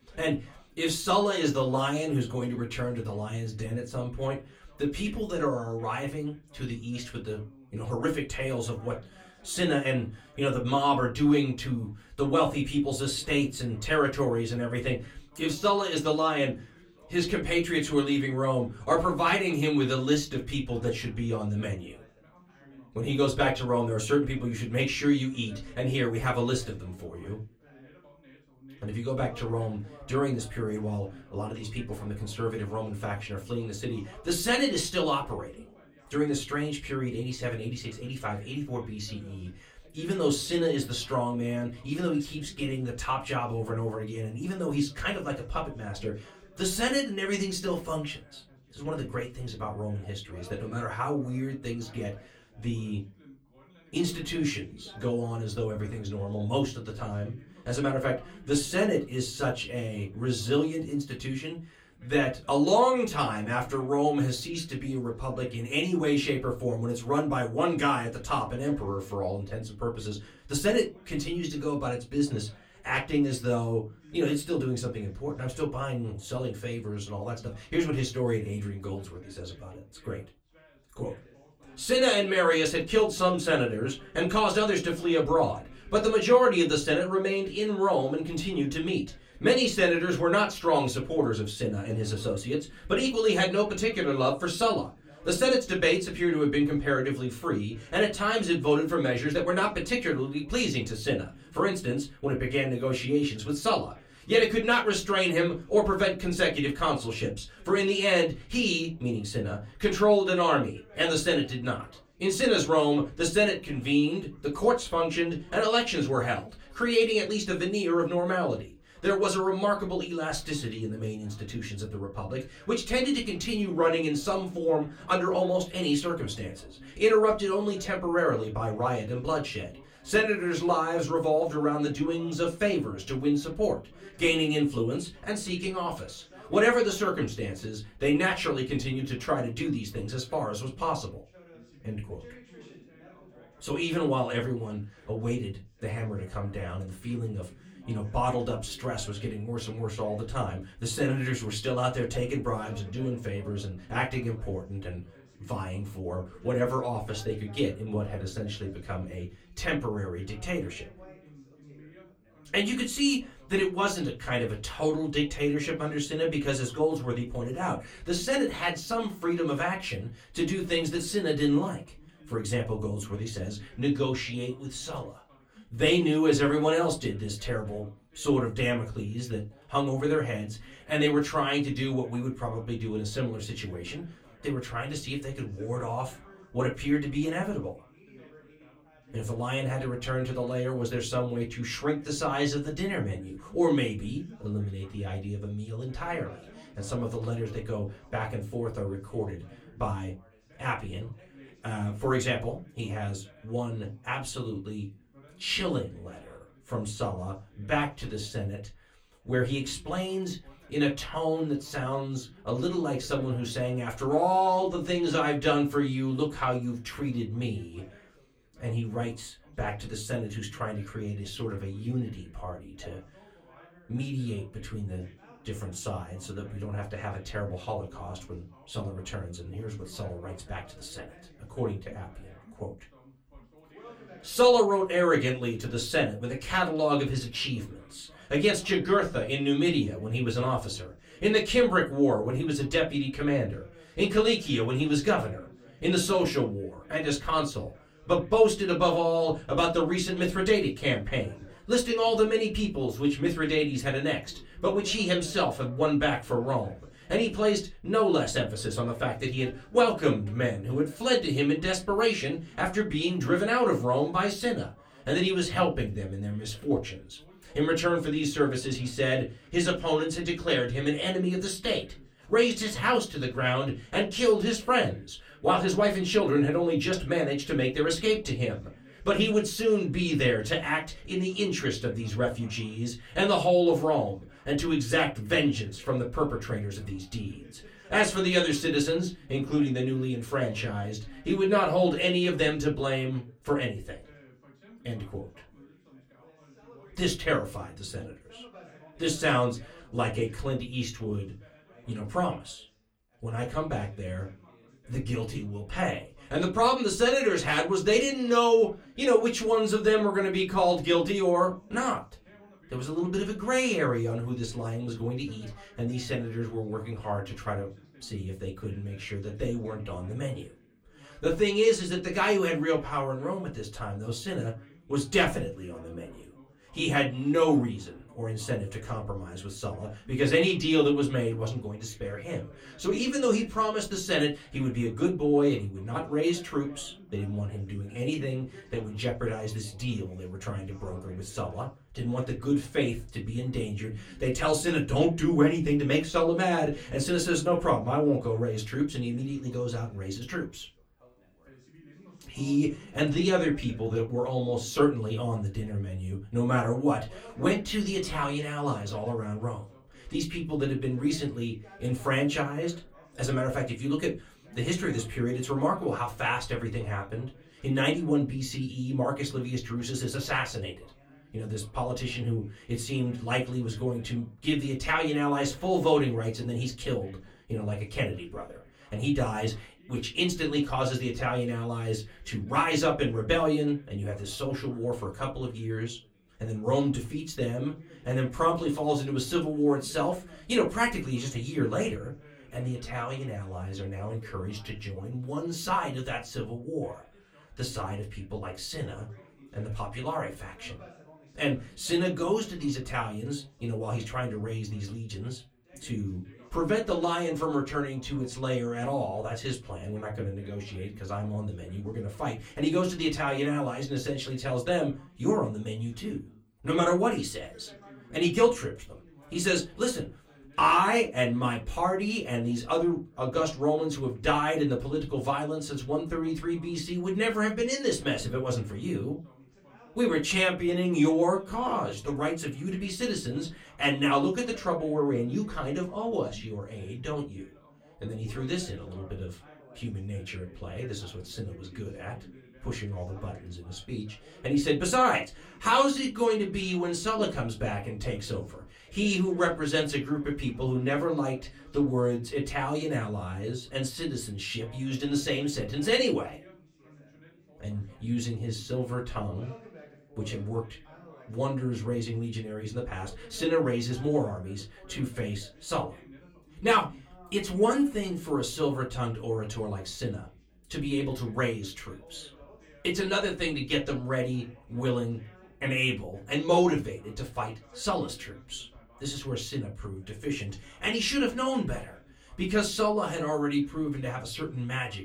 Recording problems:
off-mic speech; far
room echo; very slight; dies away in 0.2 s
background chatter; faint; throughout; 2 voices, 25 dB below the speech

